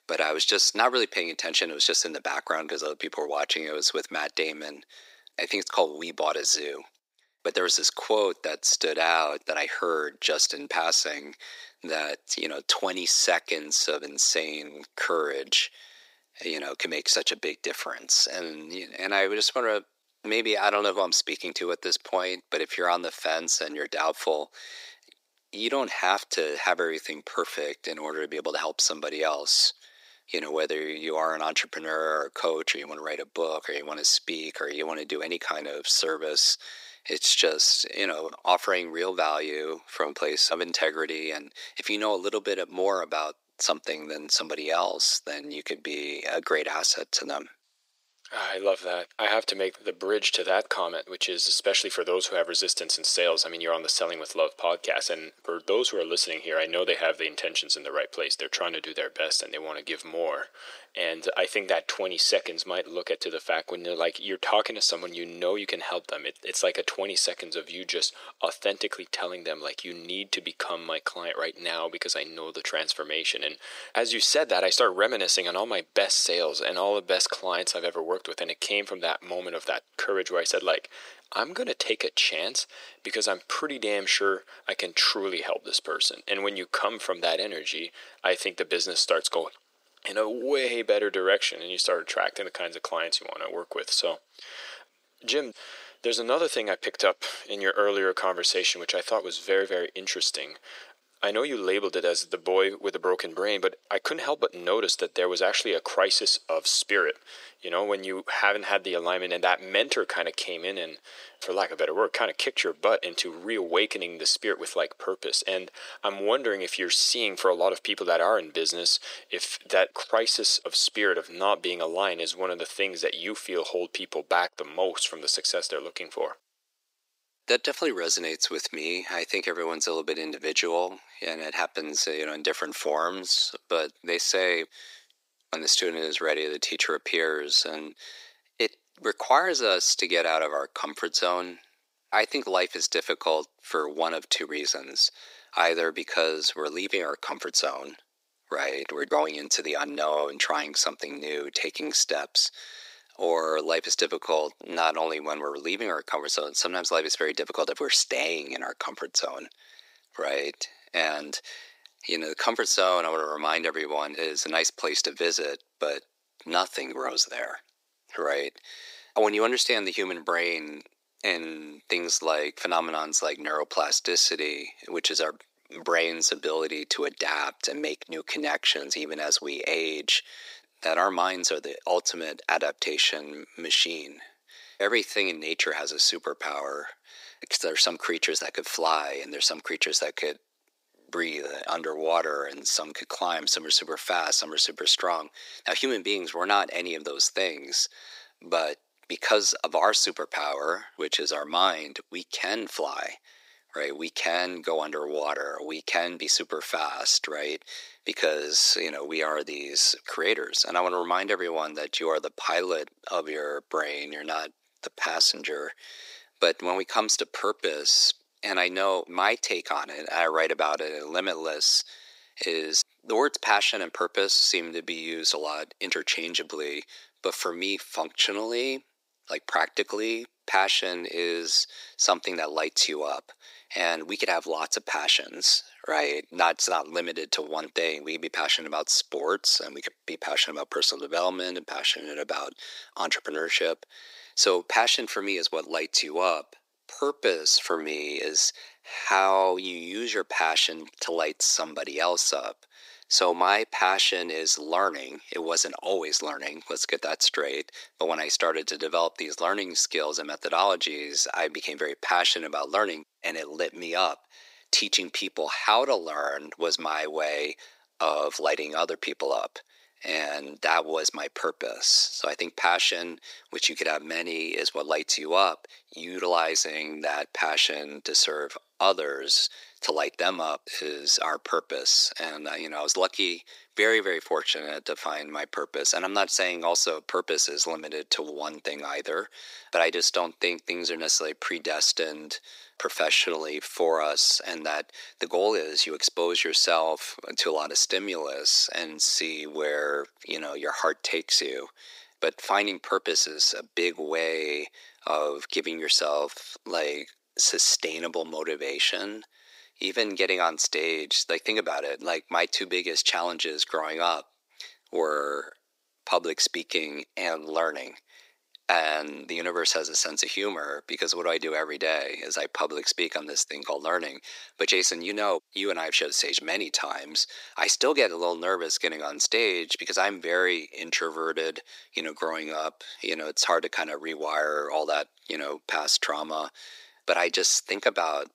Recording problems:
thin; very; fading below 350 Hz

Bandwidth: 15.5 kHz